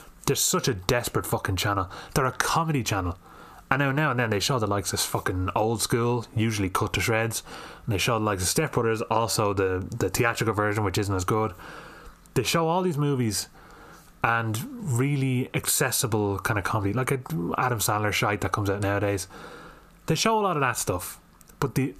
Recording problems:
squashed, flat; heavily

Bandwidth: 14.5 kHz